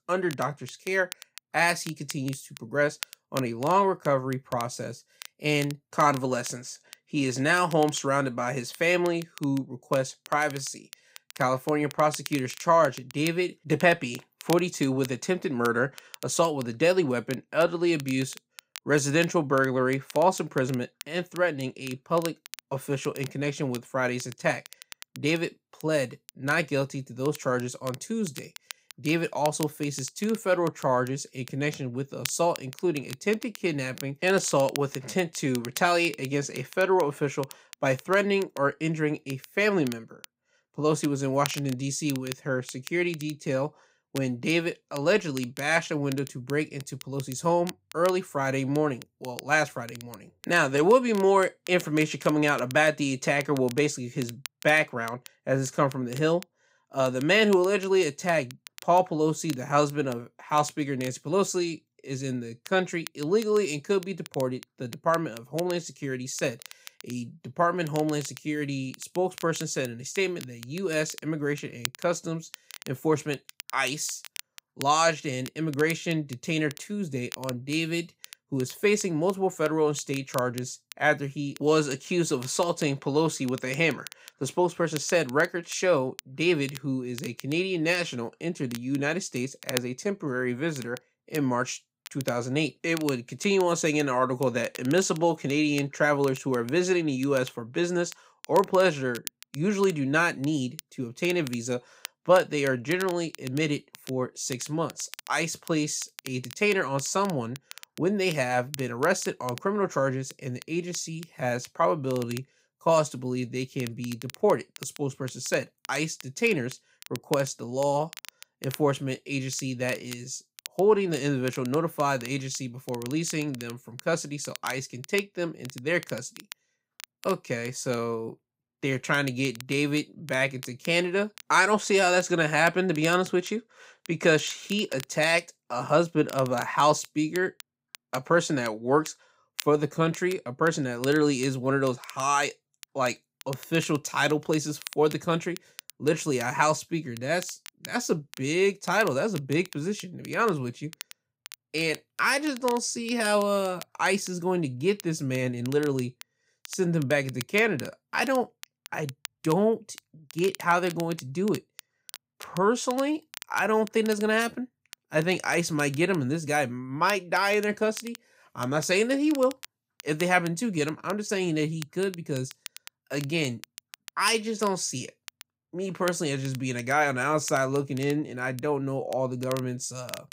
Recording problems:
crackle, like an old record; noticeable; 20 dB below the speech

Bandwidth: 15.5 kHz